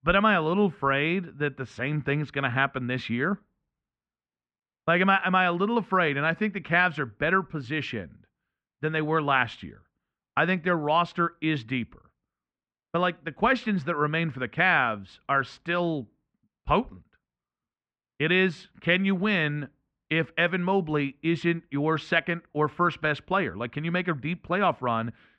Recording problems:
muffled; very; fading above 2 kHz

